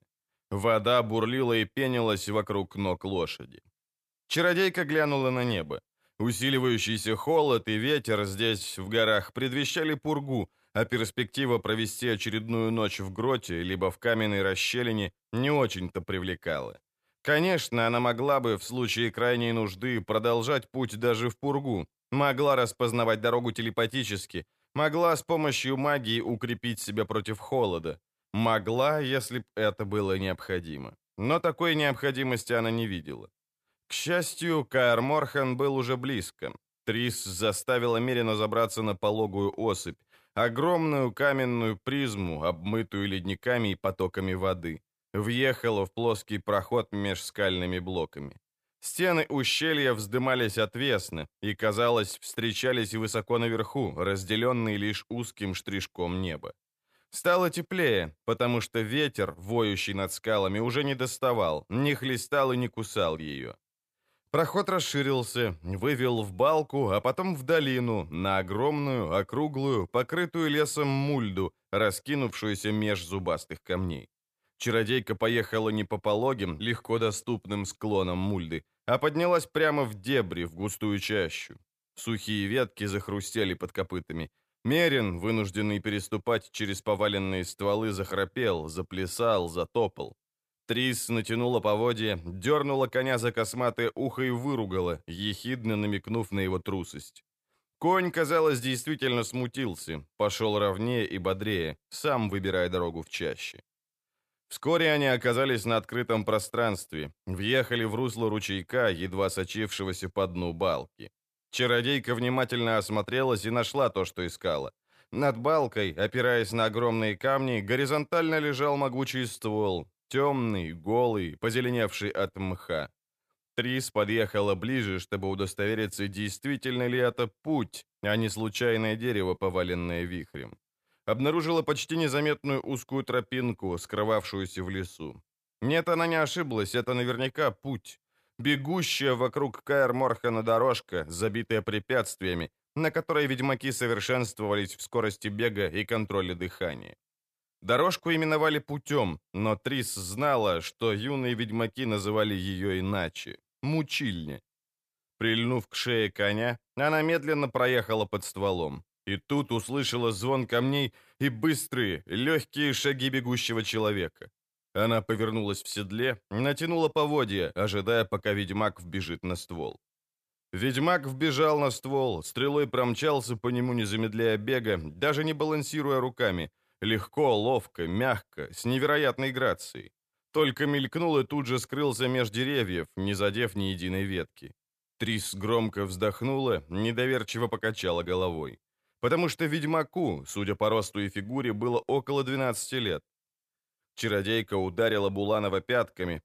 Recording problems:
none

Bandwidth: 14.5 kHz